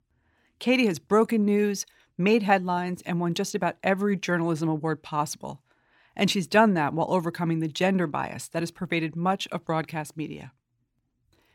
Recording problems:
none

